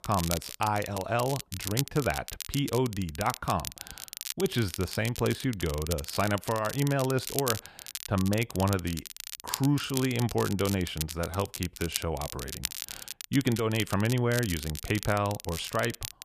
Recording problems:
crackle, like an old record; loud; 8 dB below the speech

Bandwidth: 14.5 kHz